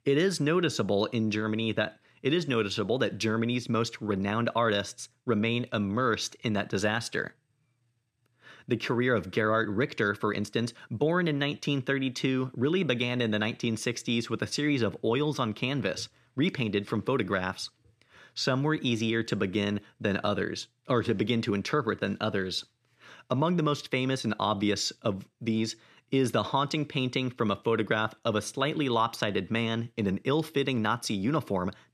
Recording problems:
none

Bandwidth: 14 kHz